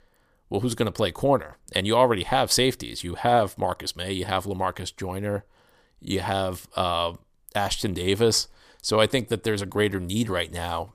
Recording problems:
none

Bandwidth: 15 kHz